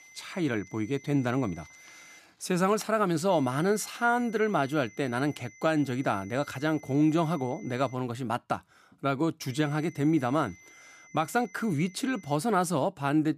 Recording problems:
high-pitched whine; faint; until 2 s, from 3.5 to 8 s and from 9.5 to 12 s; 2 kHz, 25 dB below the speech

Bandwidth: 14.5 kHz